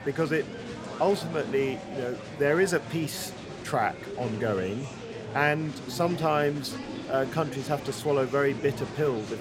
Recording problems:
murmuring crowd; loud; throughout; 10 dB below the speech

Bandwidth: 16 kHz